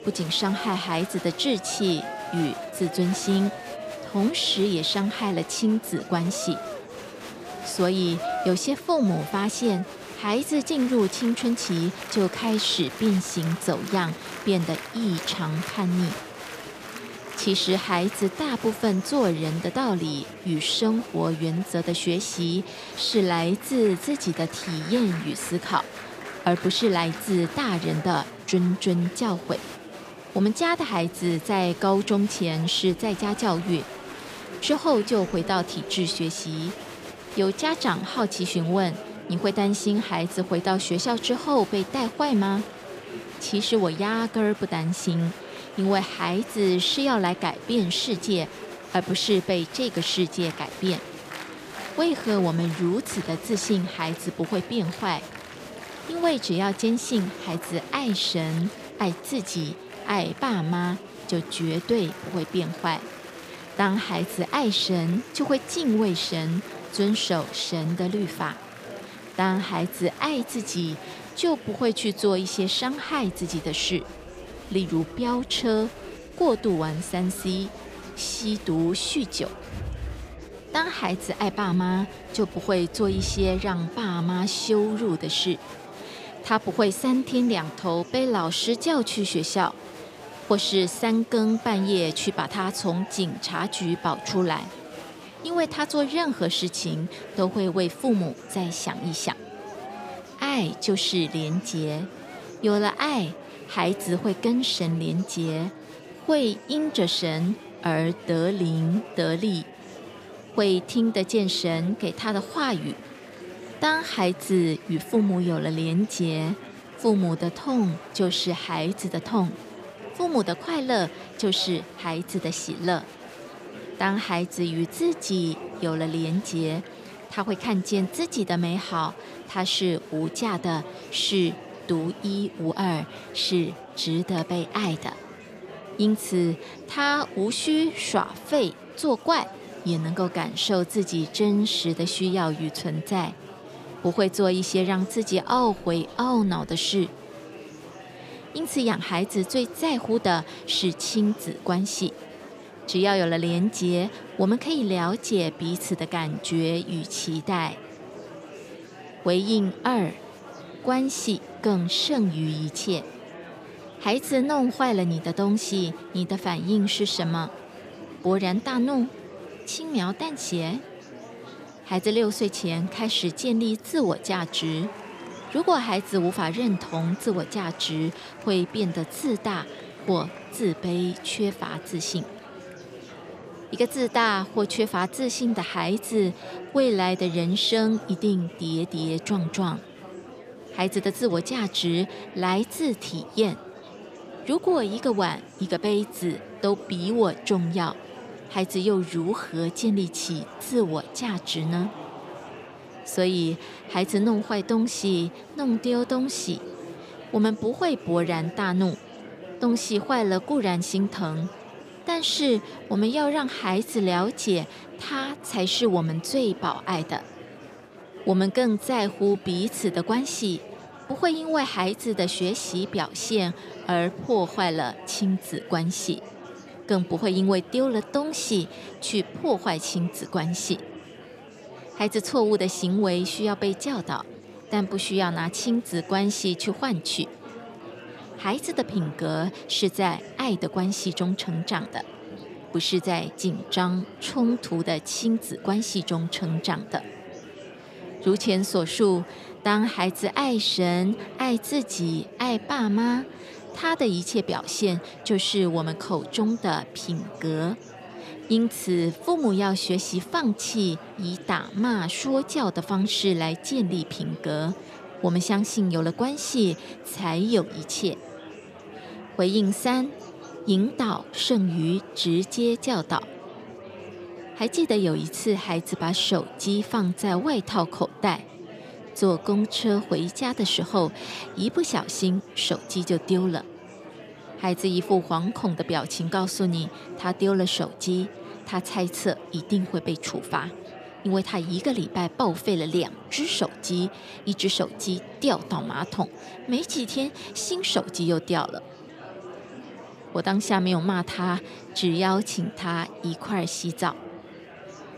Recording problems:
murmuring crowd; noticeable; throughout; 15 dB below the speech

